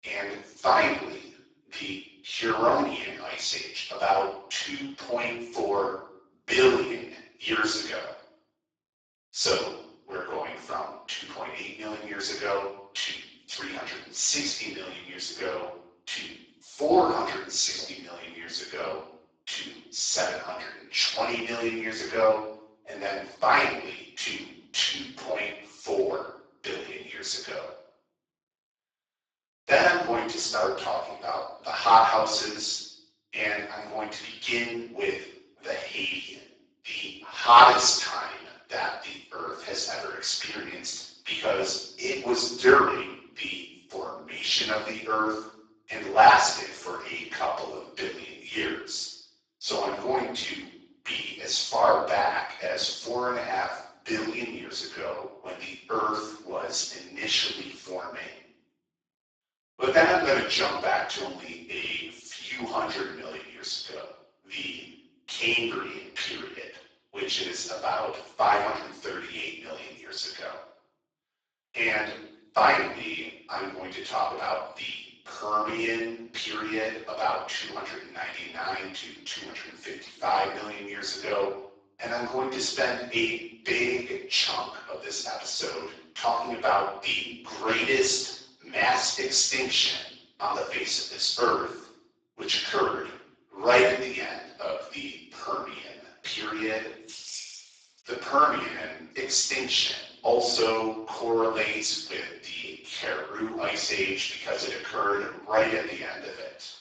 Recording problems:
off-mic speech; far
garbled, watery; badly; nothing above 7.5 kHz
thin; very; fading below 500 Hz
room echo; noticeable; dies away in 0.8 s
jangling keys; noticeable; at 1:37; peak 9 dB below the speech

